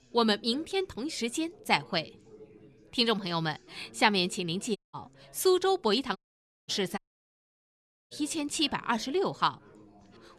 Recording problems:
background chatter; faint; throughout; 3 voices, 25 dB below the speech
audio cutting out; at 5 s, at 6 s for 0.5 s and at 7 s for 1 s

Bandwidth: 13.5 kHz